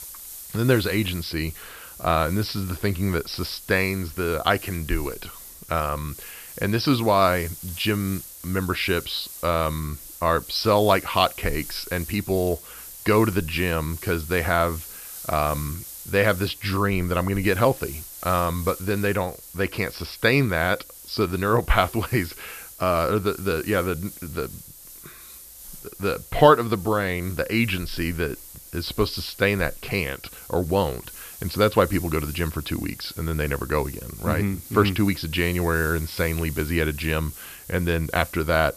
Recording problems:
high frequencies cut off; noticeable; nothing above 5.5 kHz
hiss; noticeable; throughout; 15 dB below the speech

